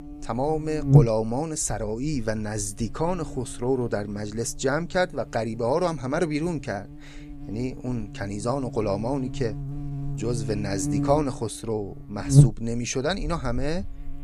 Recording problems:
electrical hum; loud; throughout; 50 Hz, 6 dB below the speech

